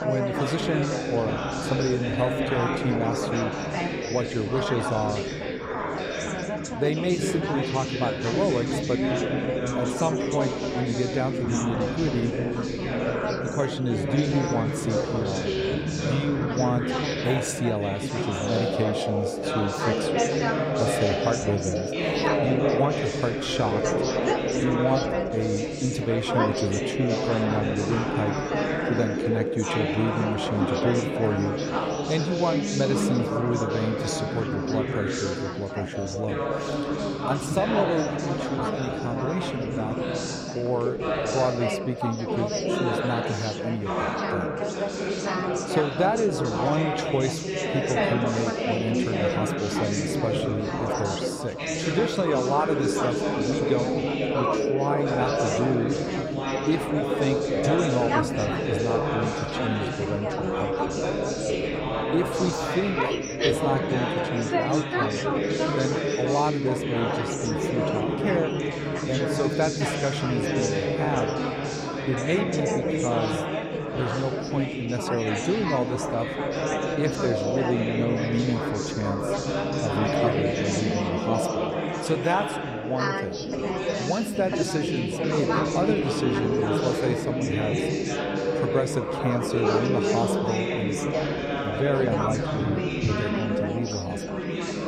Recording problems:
chatter from many people; very loud; throughout; 2 dB above the speech

